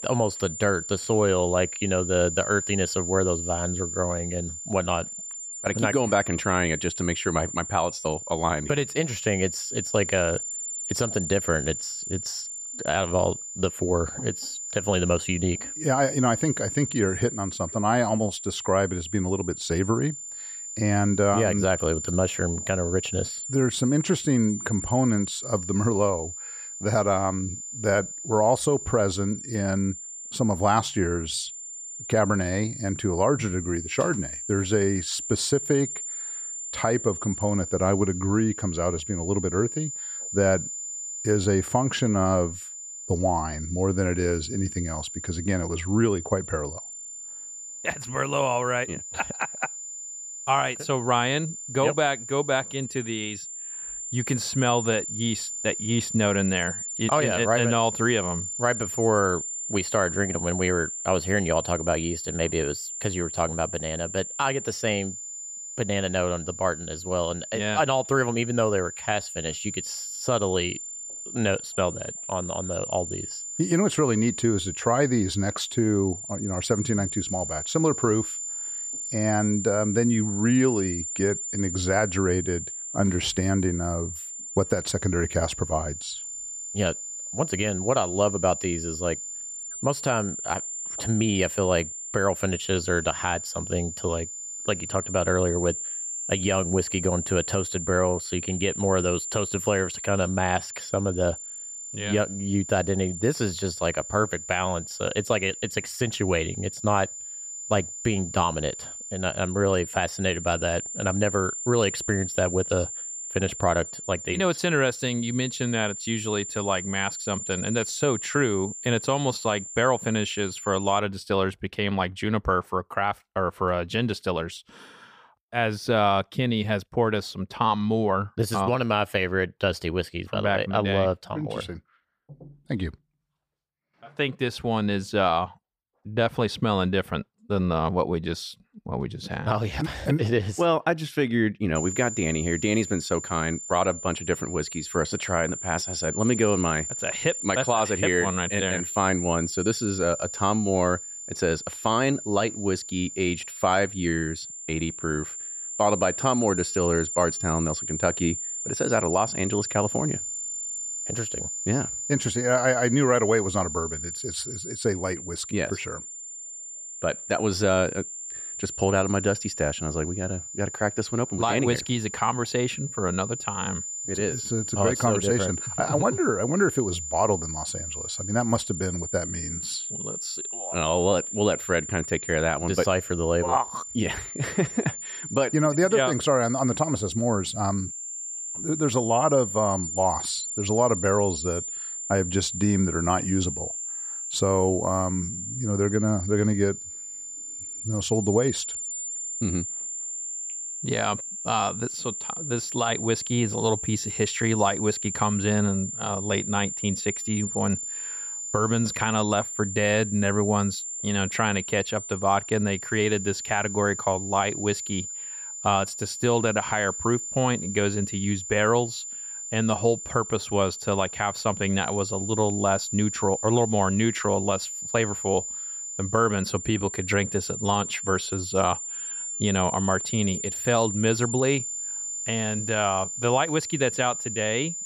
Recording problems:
high-pitched whine; loud; until 2:01 and from 2:22 on; 7 kHz, 6 dB below the speech

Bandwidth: 15 kHz